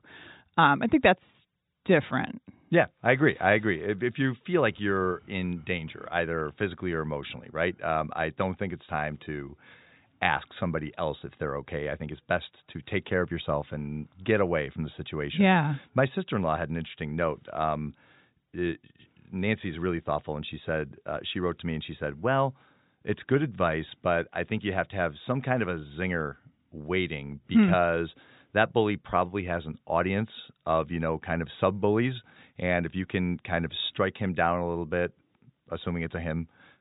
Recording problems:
high frequencies cut off; severe; nothing above 4 kHz

